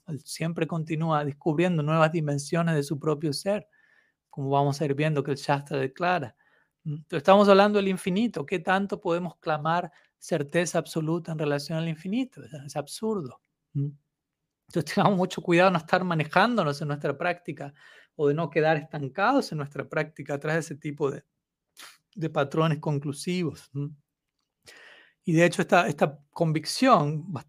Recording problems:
none

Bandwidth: 15 kHz